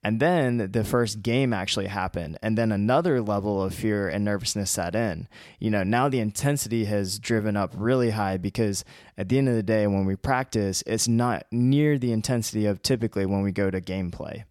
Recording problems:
none

